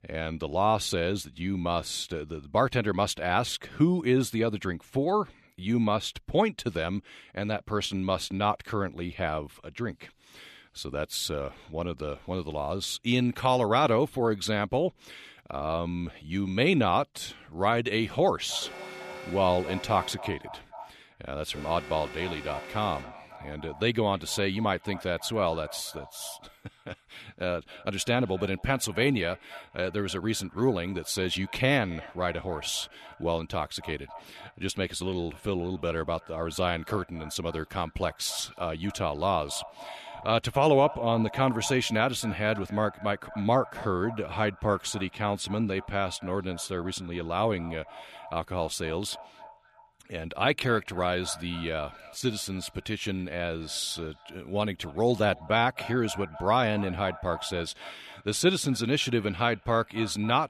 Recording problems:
echo of what is said; noticeable; from 18 s on; 270 ms later, 20 dB below the speech
alarm; faint; from 19 to 23 s; peak 10 dB below the speech

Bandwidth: 13.5 kHz